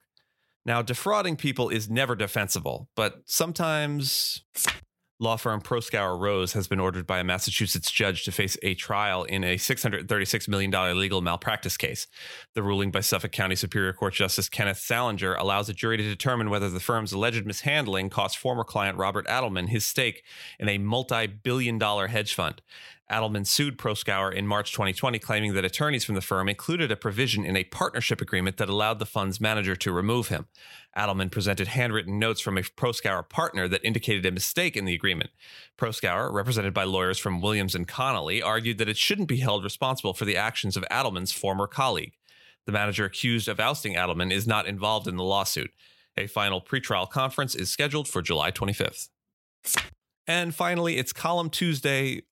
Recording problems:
none

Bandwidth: 16.5 kHz